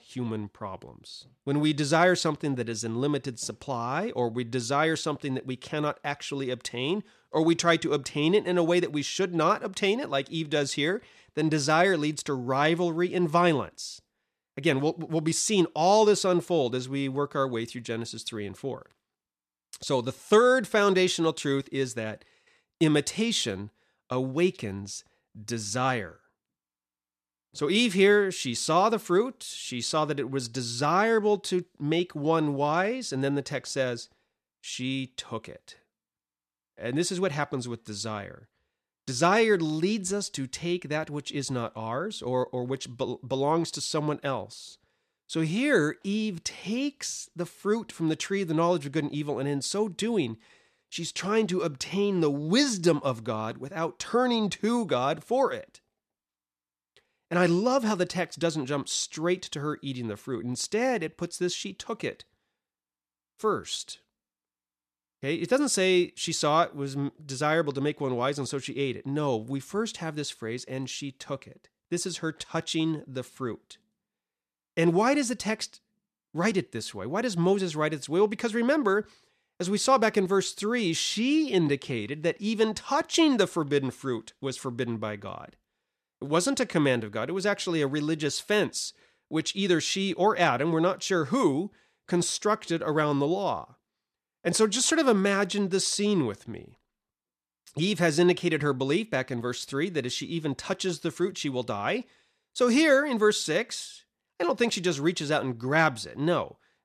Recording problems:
none

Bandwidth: 14 kHz